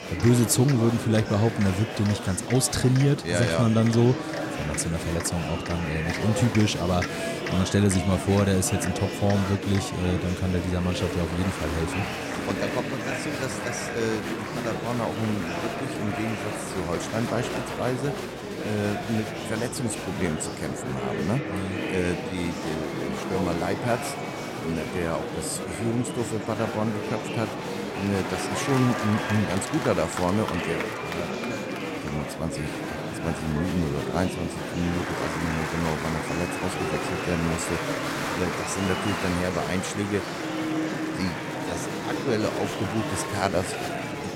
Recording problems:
murmuring crowd; loud; throughout; 3 dB below the speech

